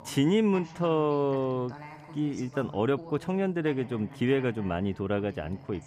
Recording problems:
voice in the background; noticeable; throughout; 15 dB below the speech

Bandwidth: 14.5 kHz